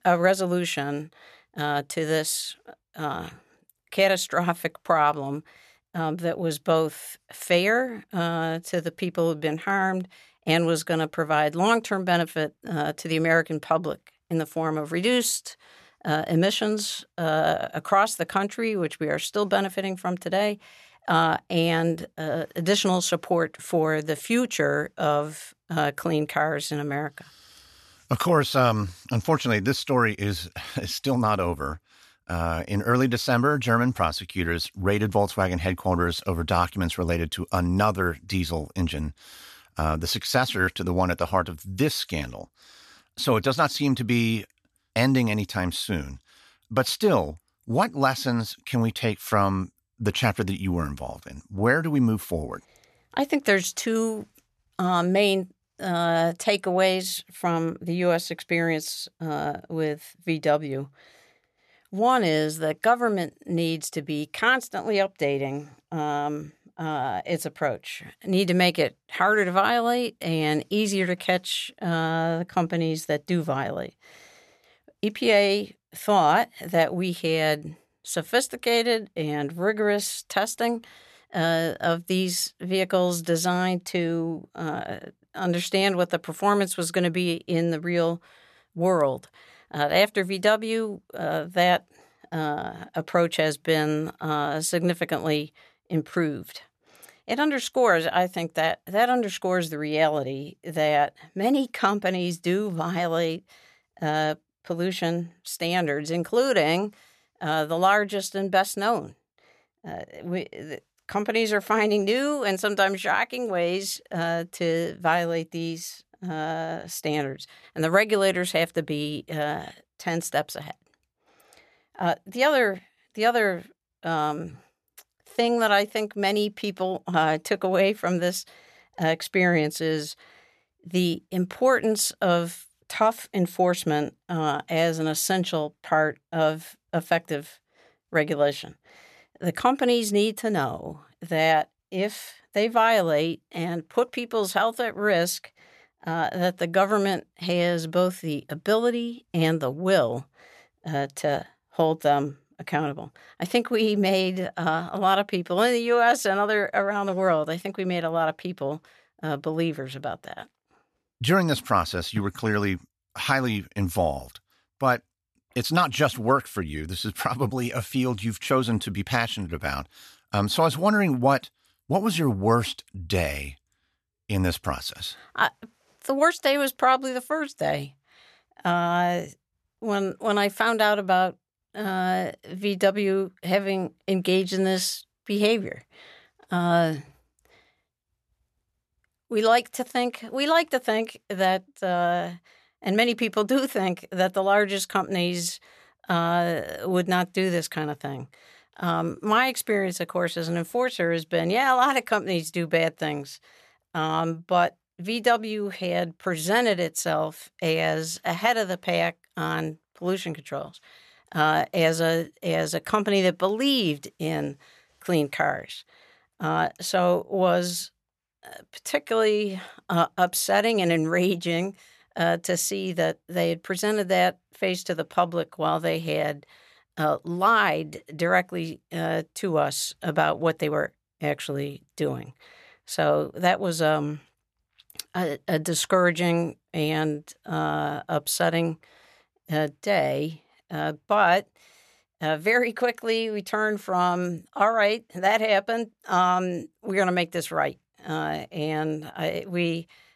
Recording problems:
none

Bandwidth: 13.5 kHz